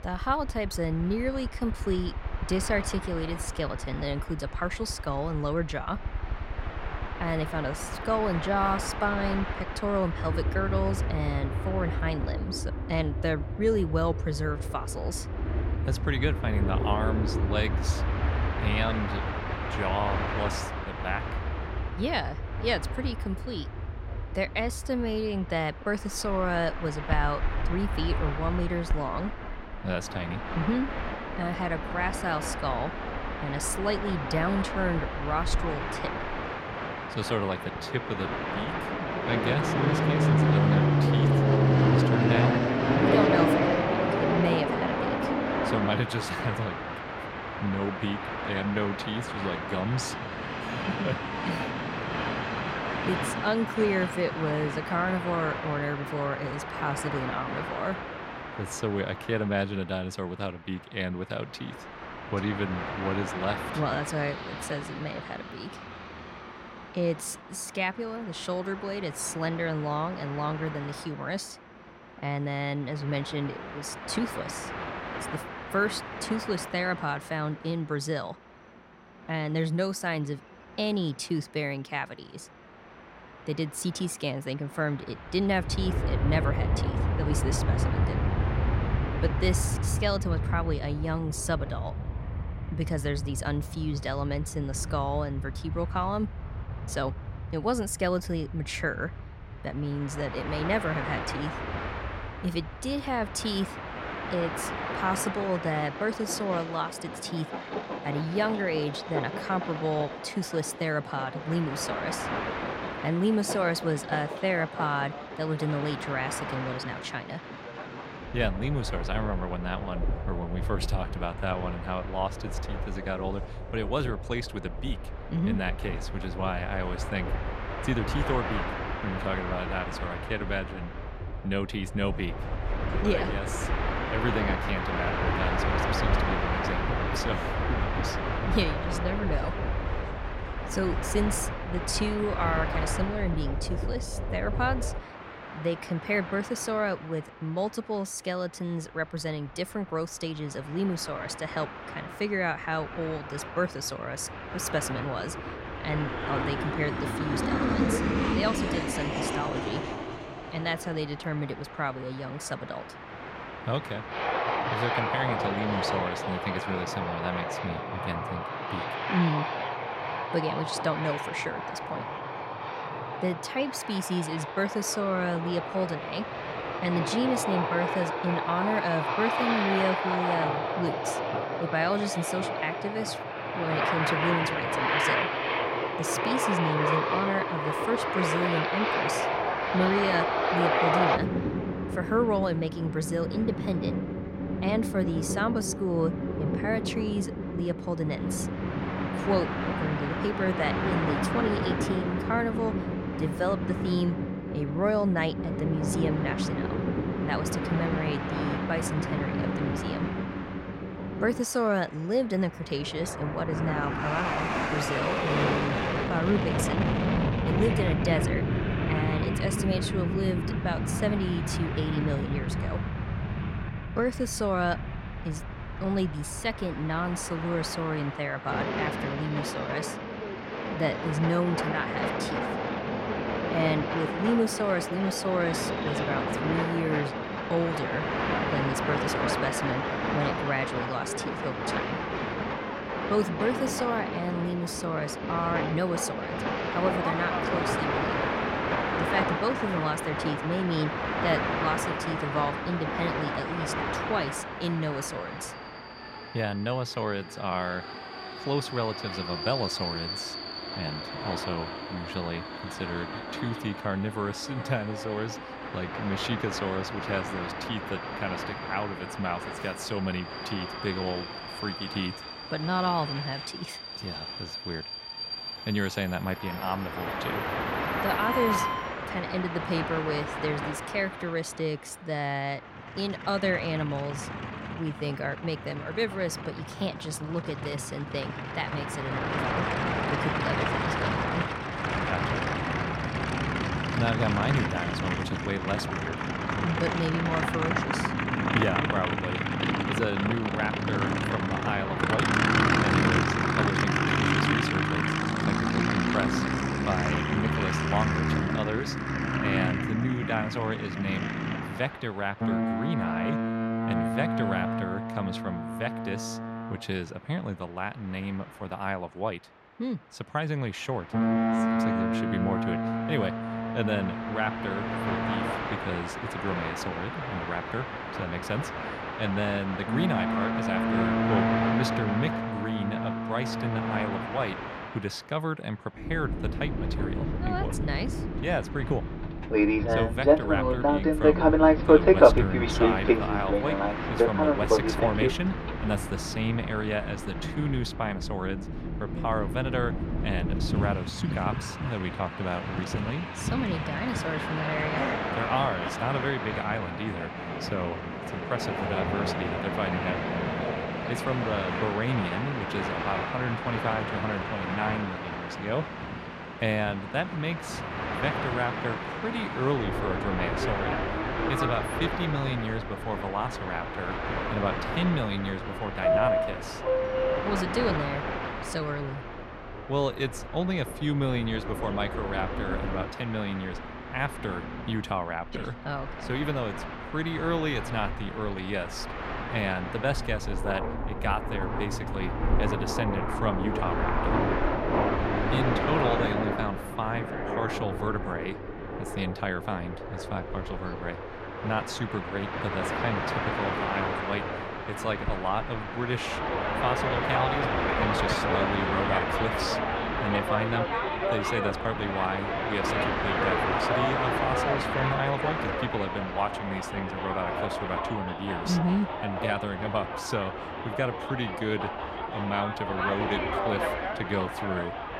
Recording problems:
train or aircraft noise; very loud; throughout; 1 dB above the speech

